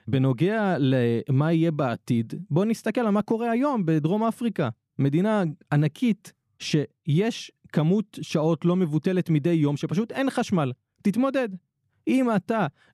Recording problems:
none

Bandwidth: 14.5 kHz